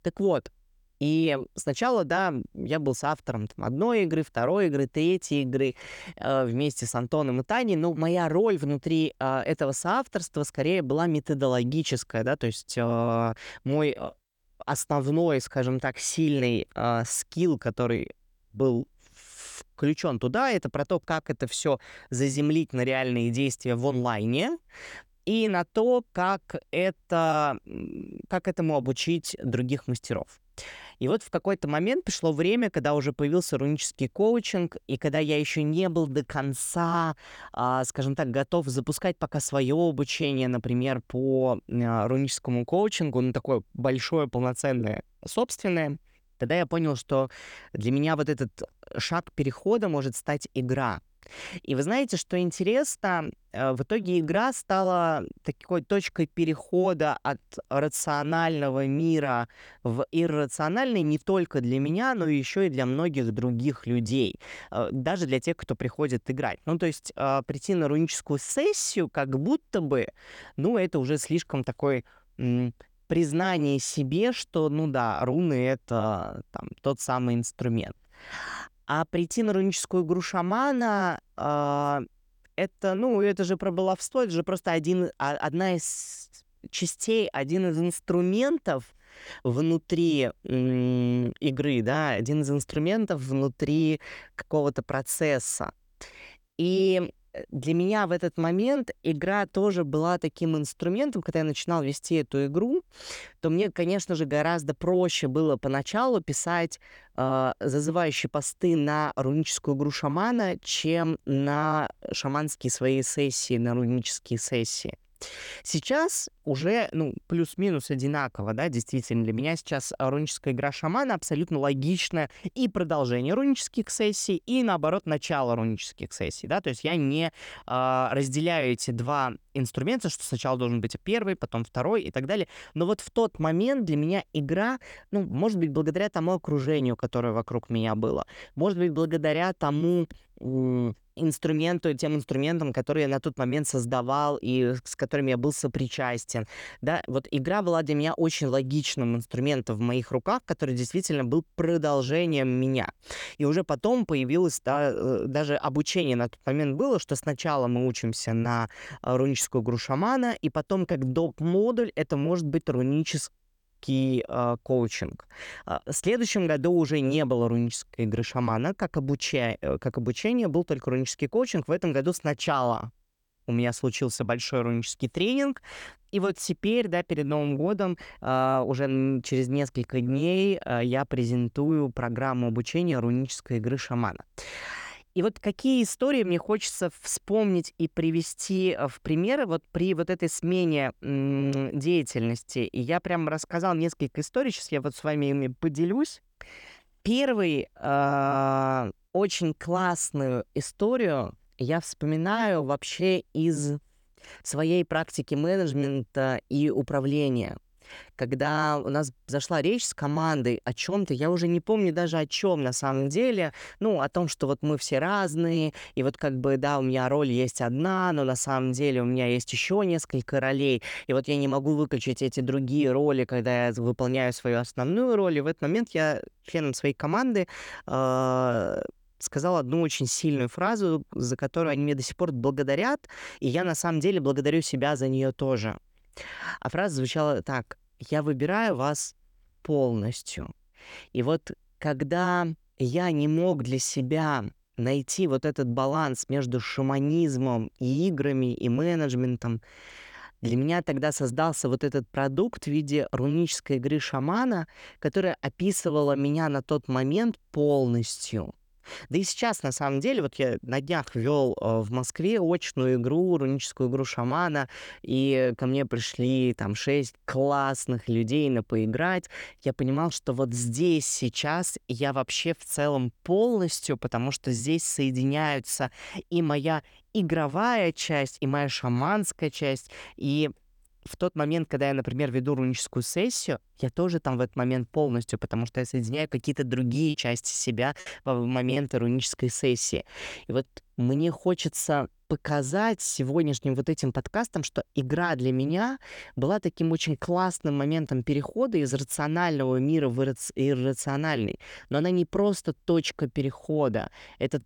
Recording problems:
choppy; very; from 4:47 to 4:49; 7% of the speech affected

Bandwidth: 18.5 kHz